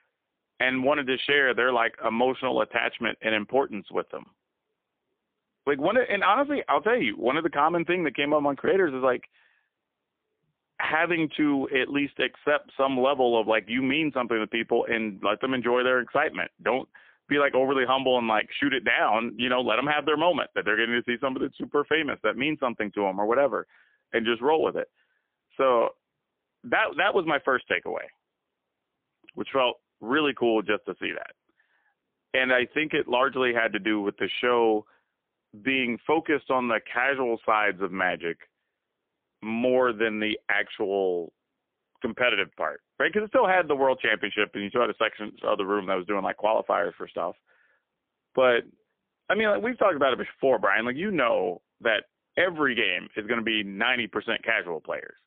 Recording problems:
phone-call audio; poor line; nothing above 3.5 kHz

